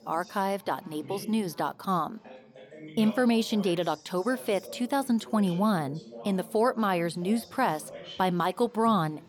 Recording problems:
background chatter; noticeable; throughout; 3 voices, 20 dB below the speech

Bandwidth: 18 kHz